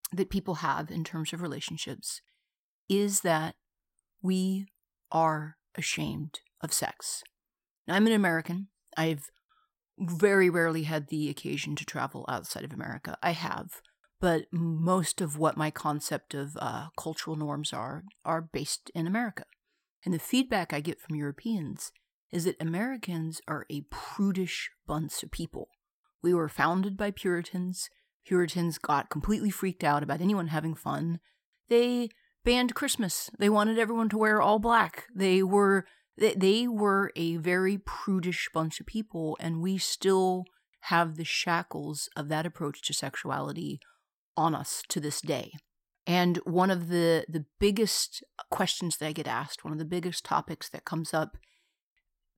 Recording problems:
none

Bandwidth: 16.5 kHz